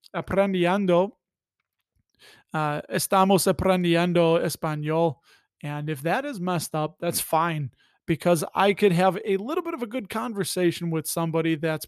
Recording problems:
none

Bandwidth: 13.5 kHz